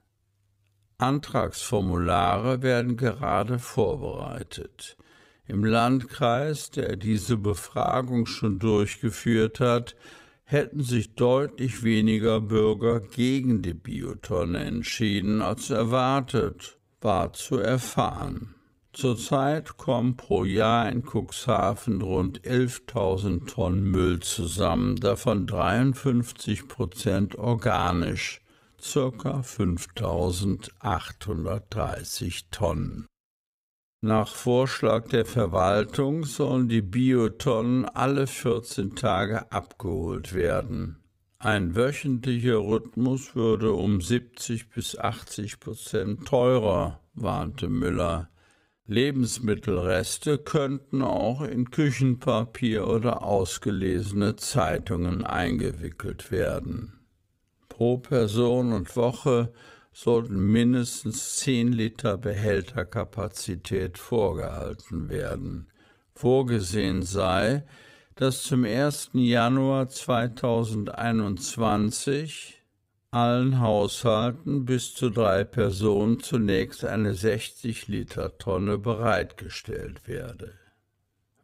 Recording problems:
wrong speed, natural pitch; too slow; 0.6 times normal speed

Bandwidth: 15.5 kHz